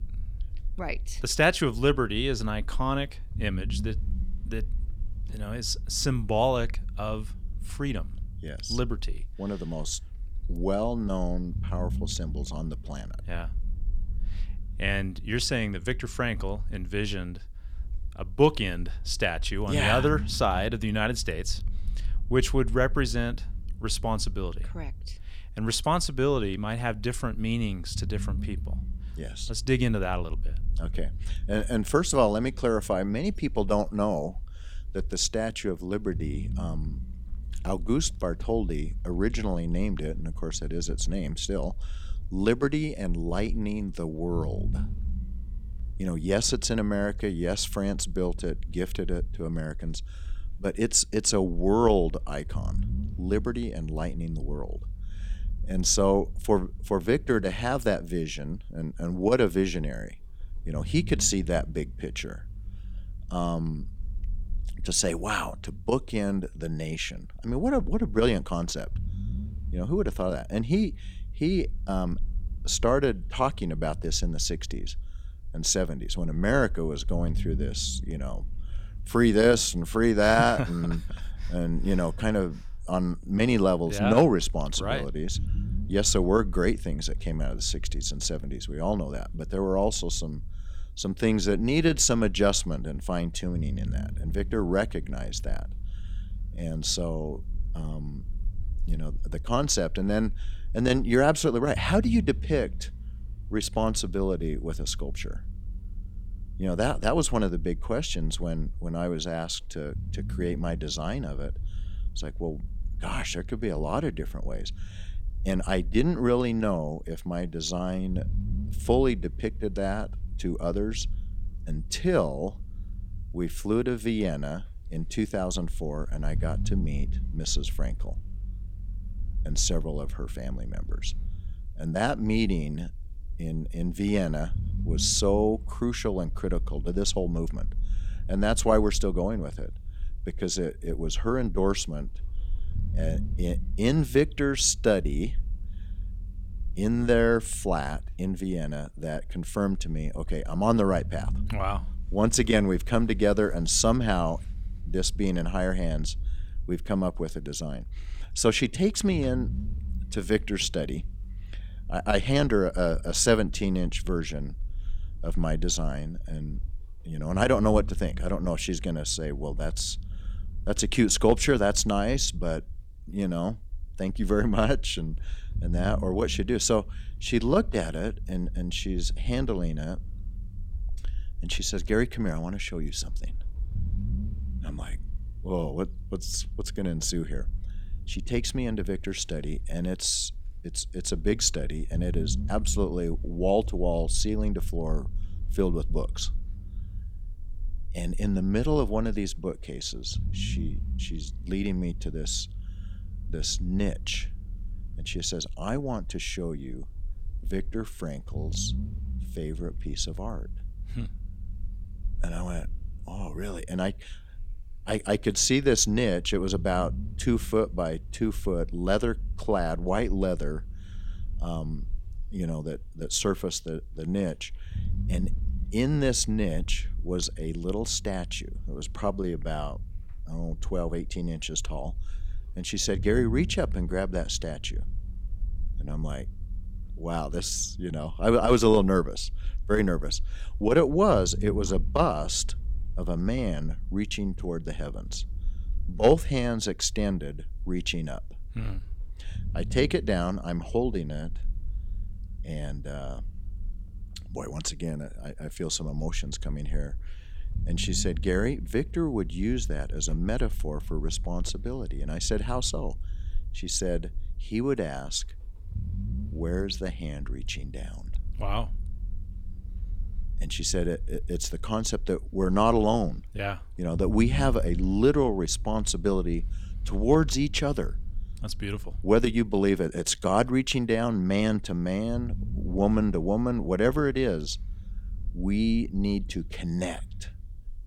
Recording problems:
low rumble; faint; throughout; 25 dB below the speech

